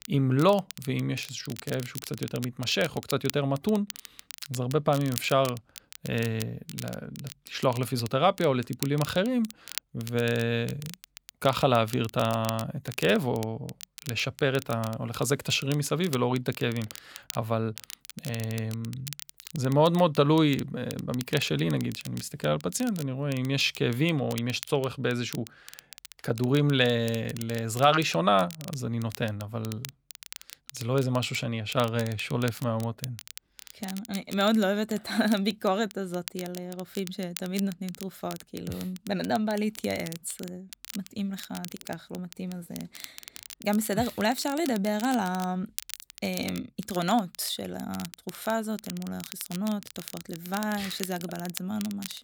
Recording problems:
crackle, like an old record; noticeable; 15 dB below the speech

